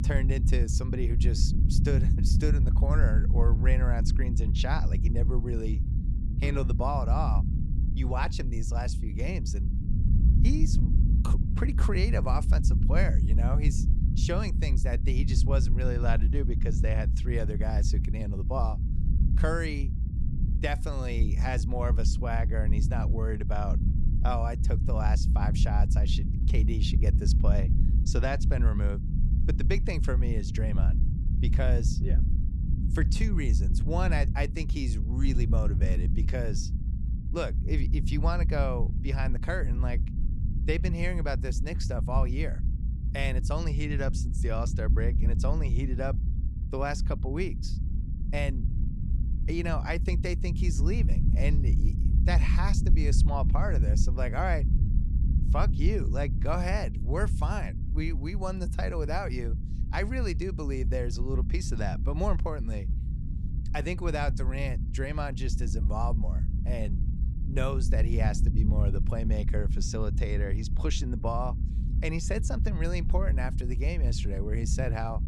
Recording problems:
low rumble; loud; throughout; 8 dB below the speech

